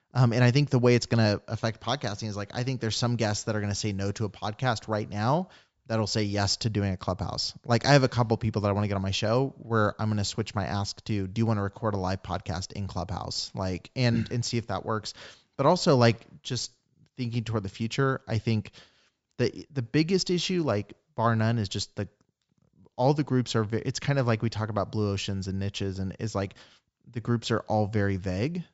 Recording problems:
high frequencies cut off; noticeable; nothing above 8 kHz

